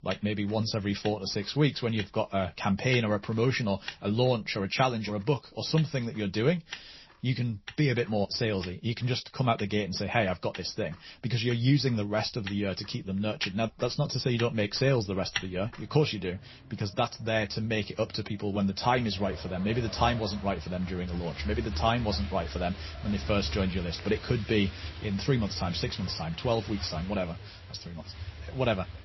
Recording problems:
garbled, watery; slightly; nothing above 5.5 kHz
traffic noise; noticeable; throughout; 10 dB below the speech

